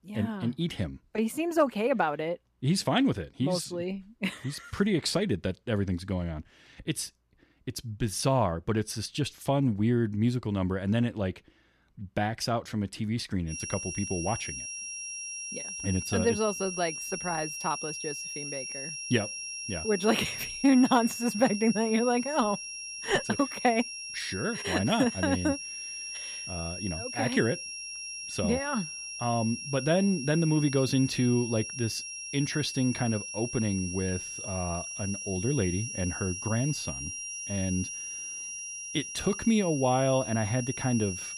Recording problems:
high-pitched whine; loud; from 14 s on; 5.5 kHz, 6 dB below the speech

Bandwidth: 14.5 kHz